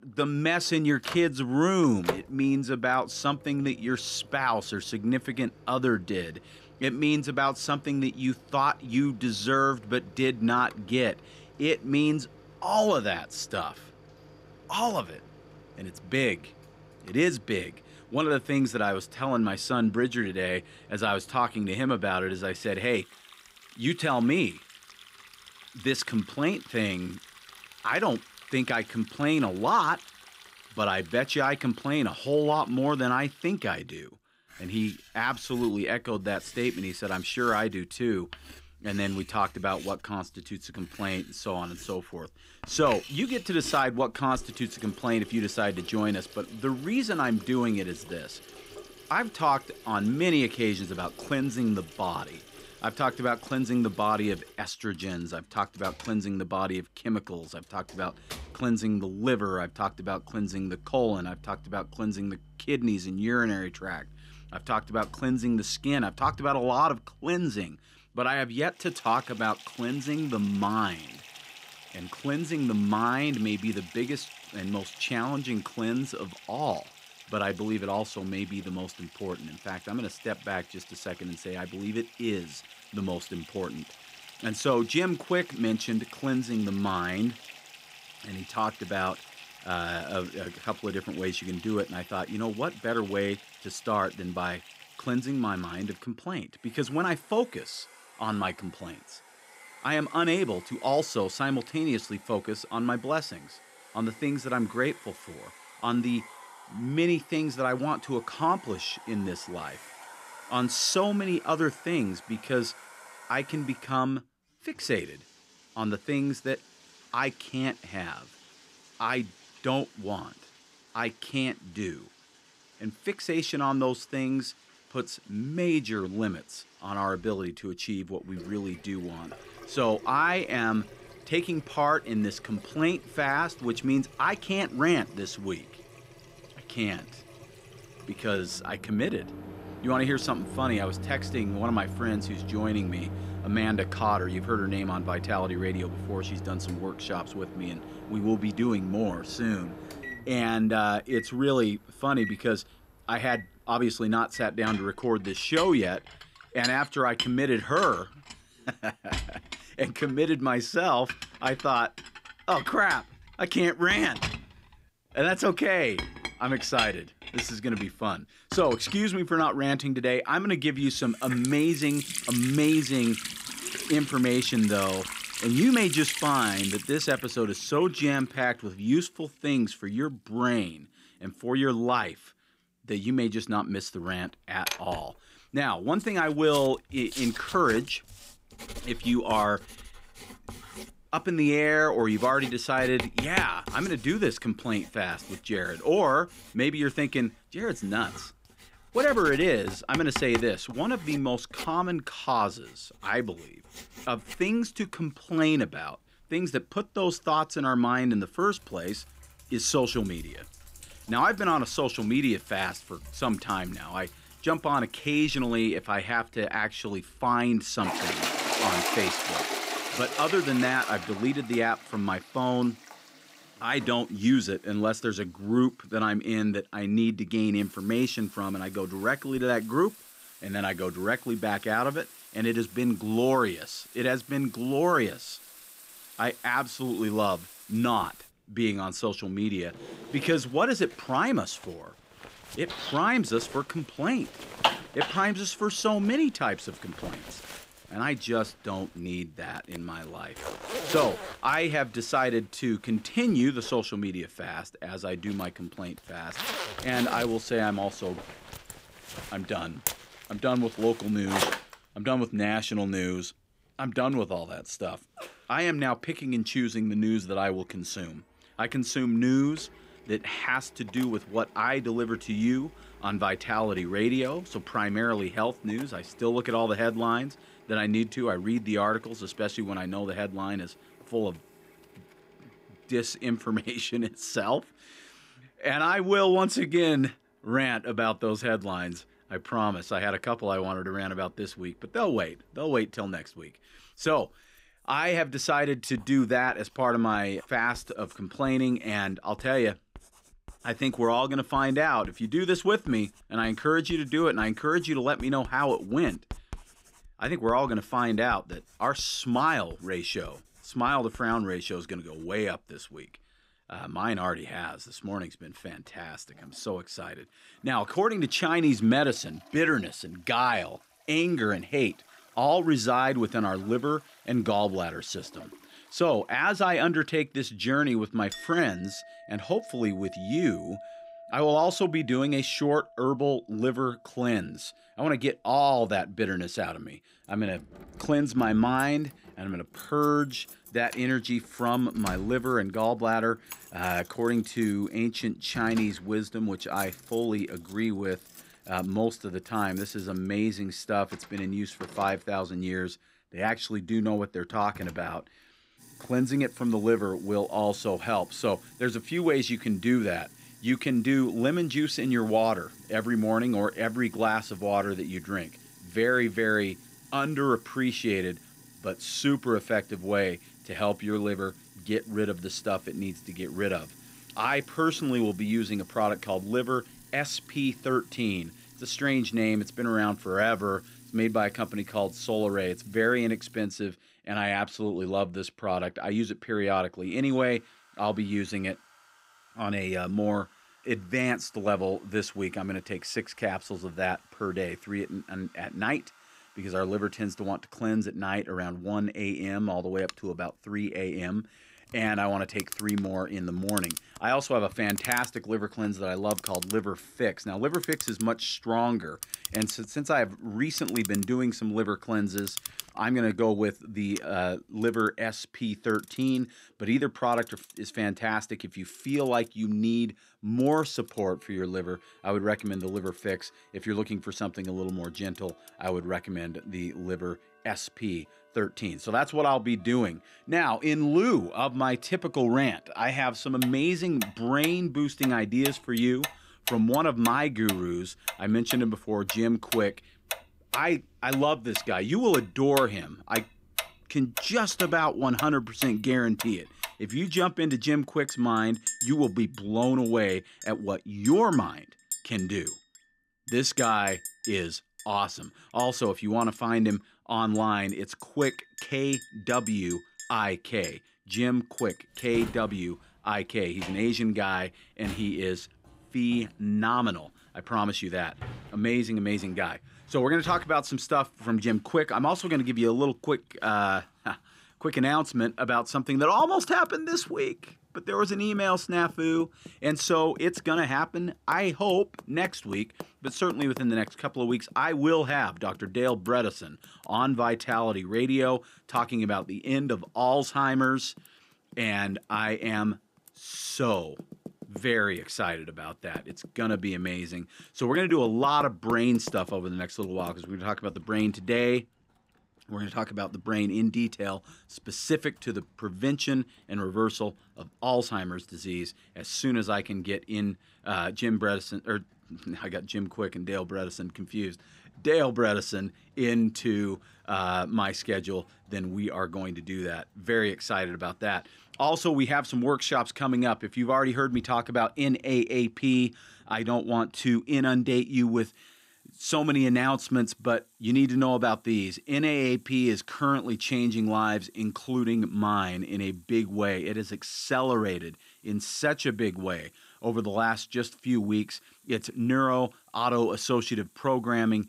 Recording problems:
household noises; noticeable; throughout; 10 dB below the speech

